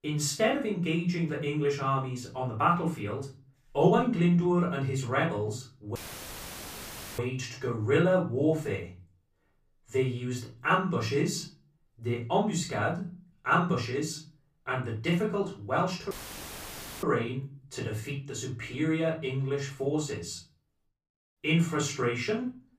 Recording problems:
off-mic speech; far
room echo; slight; dies away in 0.3 s
audio cutting out; filled with static; at 6 s for 1 s and at 16 s for 1 s

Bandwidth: 15 kHz